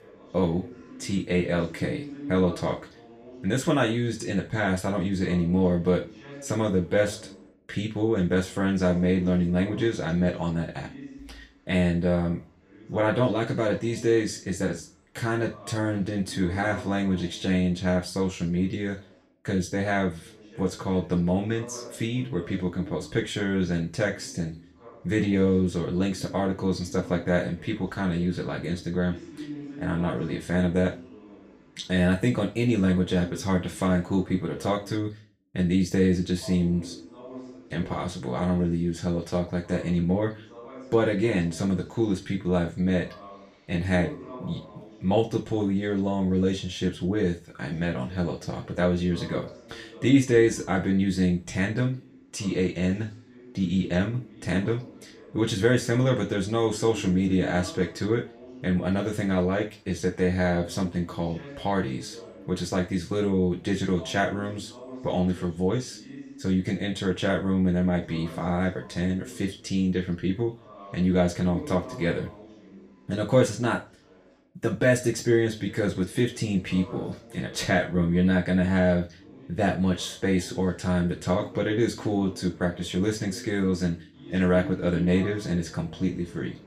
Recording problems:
off-mic speech; far
room echo; very slight; dies away in 0.3 s
voice in the background; noticeable; throughout; 20 dB below the speech

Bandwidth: 15 kHz